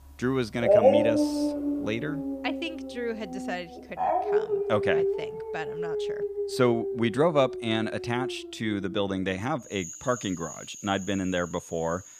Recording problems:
animal sounds; very loud; throughout; 1 dB above the speech

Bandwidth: 15 kHz